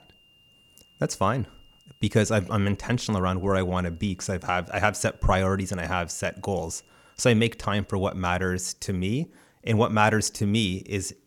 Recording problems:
high-pitched whine; faint; until 8 s; 3 kHz, 35 dB below the speech

